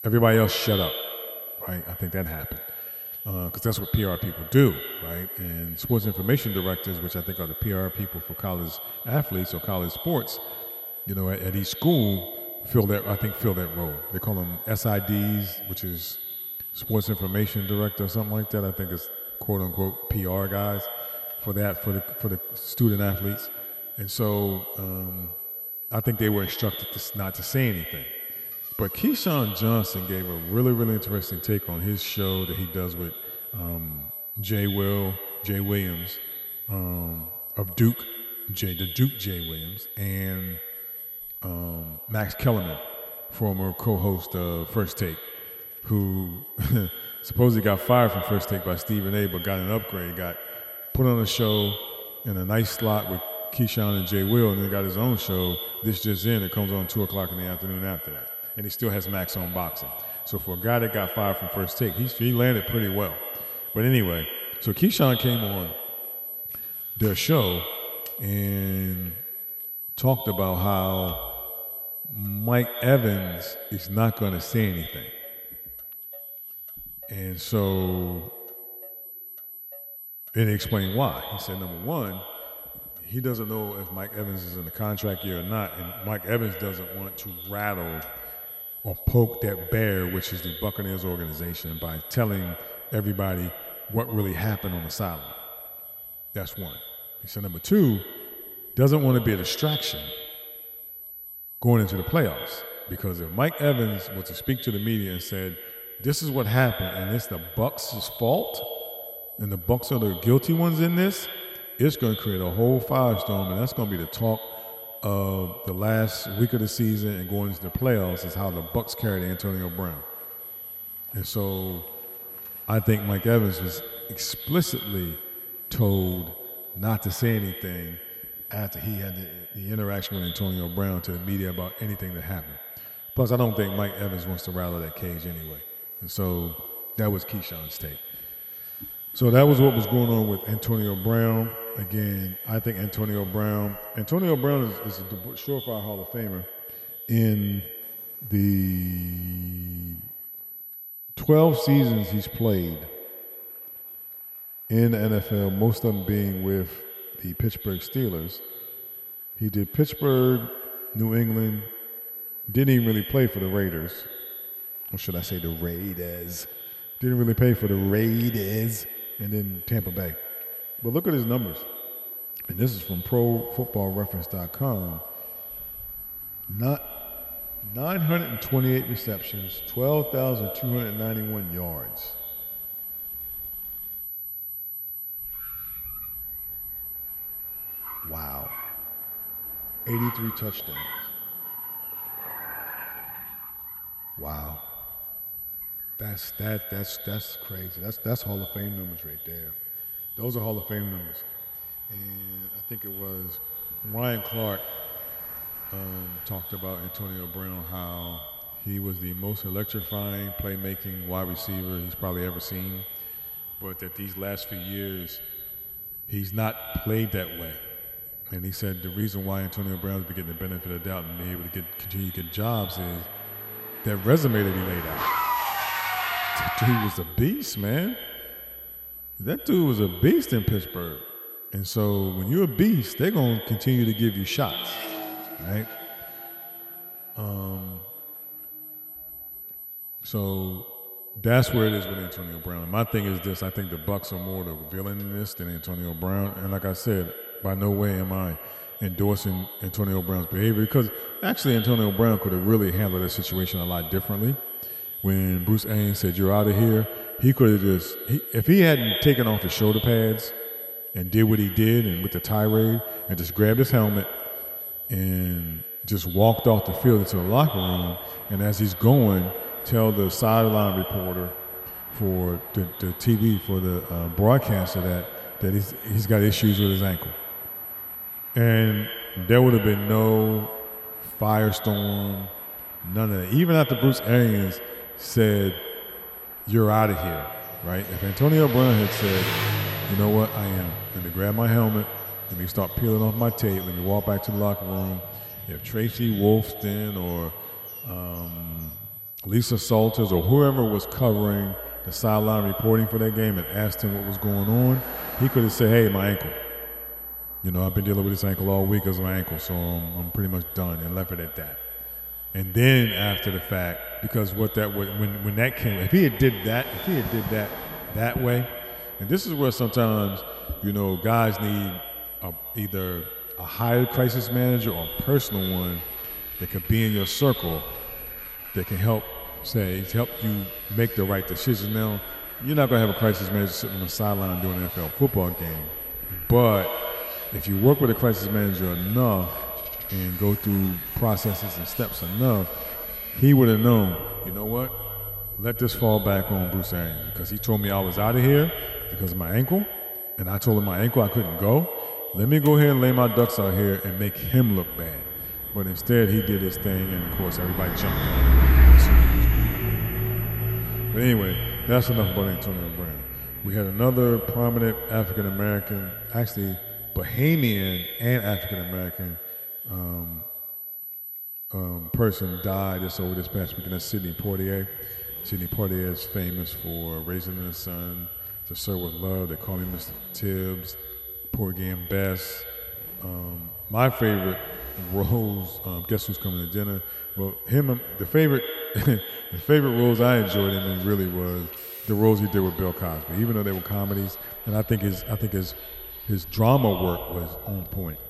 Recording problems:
echo of what is said; noticeable; throughout; 100 ms later, 15 dB below the speech
high-pitched whine; loud; throughout; 12 kHz, 8 dB below the speech
traffic noise; loud; throughout; 8 dB below the speech

